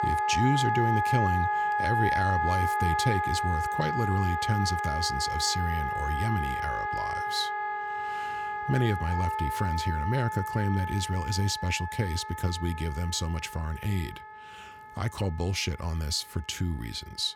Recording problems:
background music; very loud; throughout; as loud as the speech

